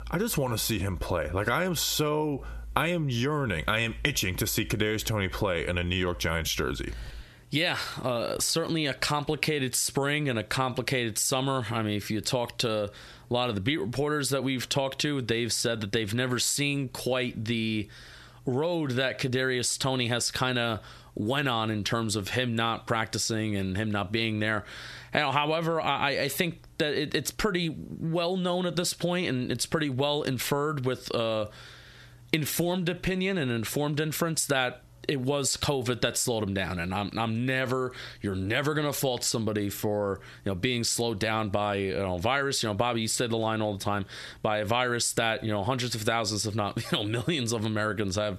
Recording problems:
squashed, flat; heavily

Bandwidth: 13.5 kHz